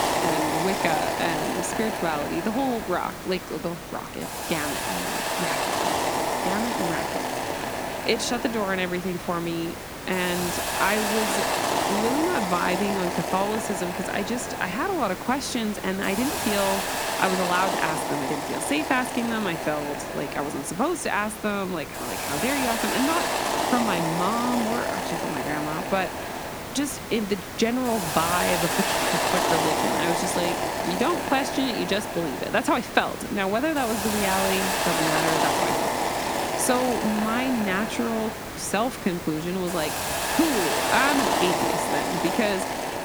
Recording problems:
hiss; loud; throughout; as loud as the speech

